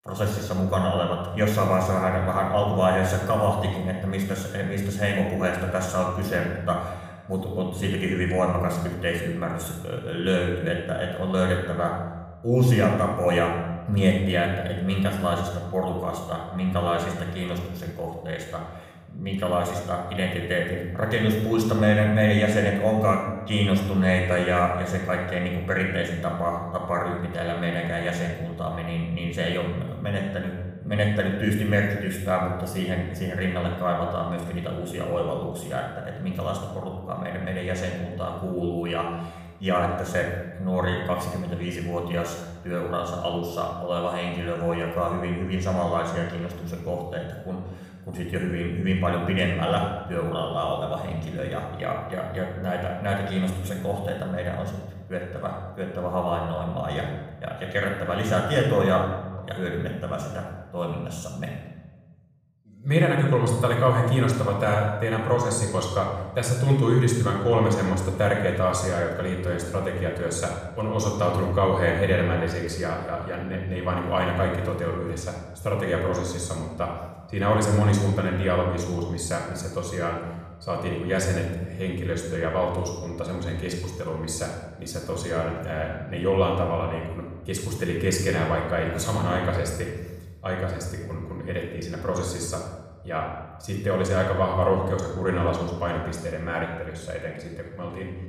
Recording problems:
room echo; noticeable; dies away in 1 s
off-mic speech; somewhat distant

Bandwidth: 15 kHz